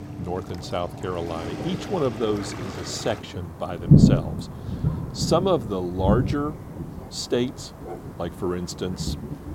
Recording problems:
rain or running water; very loud; throughout; 2 dB above the speech

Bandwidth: 16.5 kHz